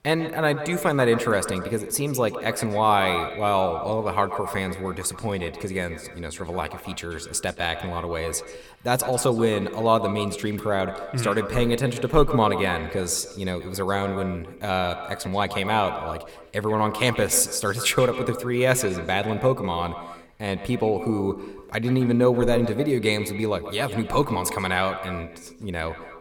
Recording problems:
echo of what is said; strong; throughout; 130 ms later, 10 dB below the speech

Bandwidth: 18 kHz